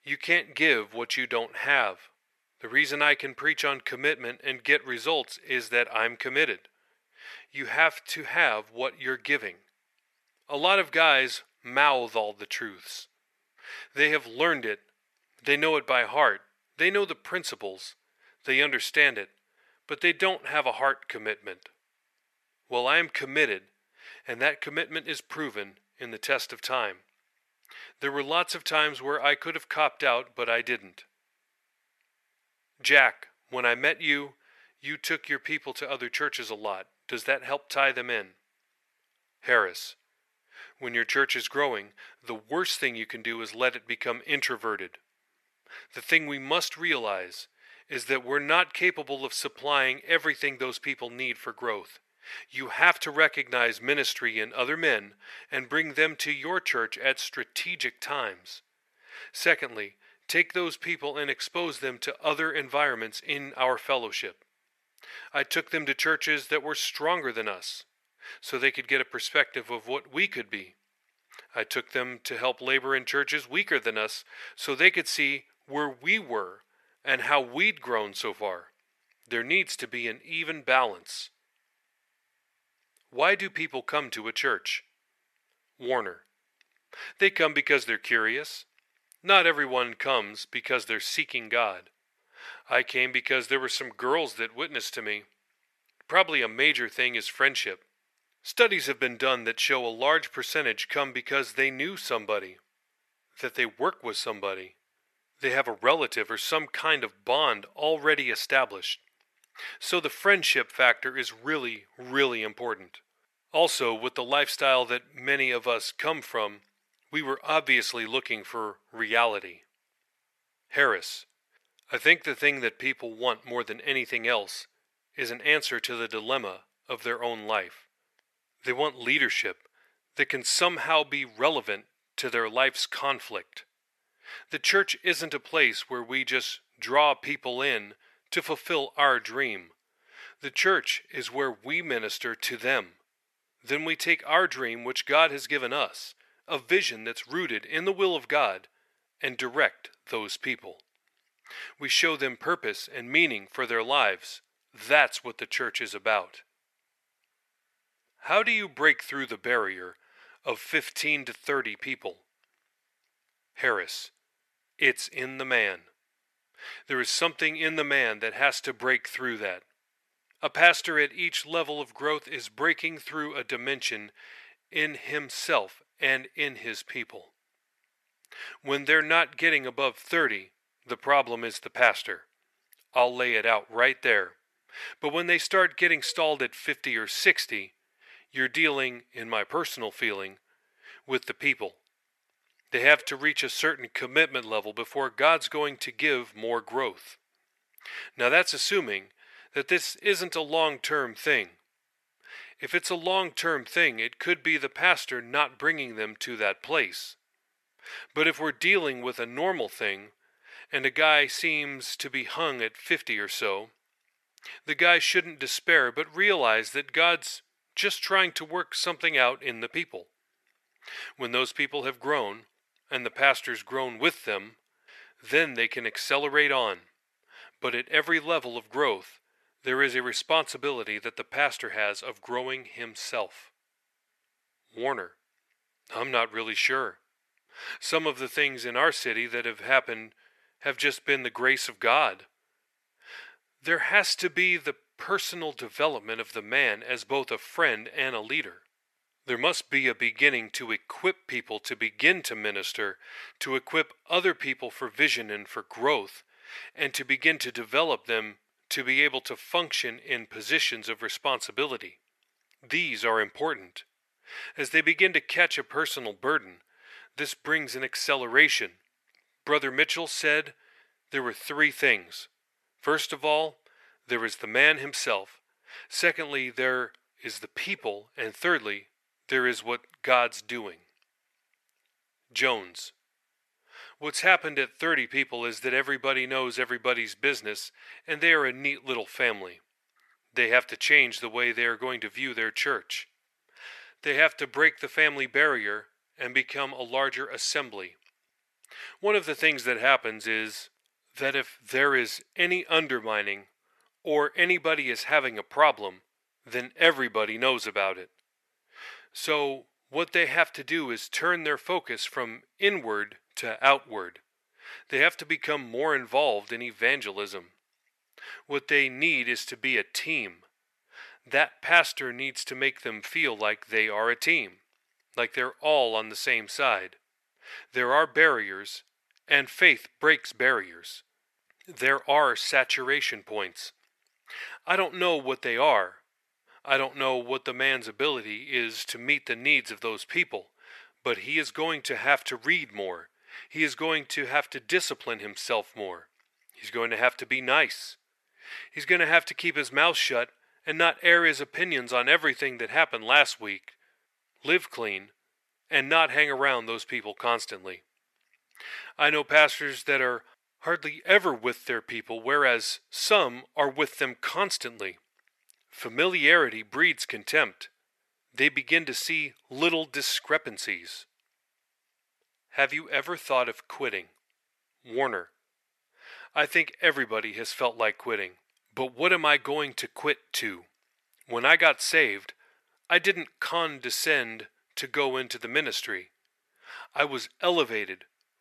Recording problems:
thin; very; fading below 550 Hz

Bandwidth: 13.5 kHz